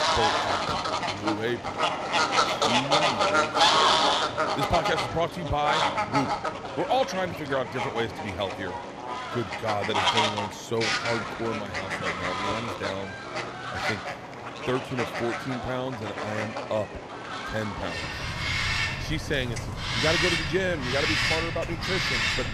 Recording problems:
animal sounds; very loud; throughout; 4 dB above the speech

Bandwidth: 14 kHz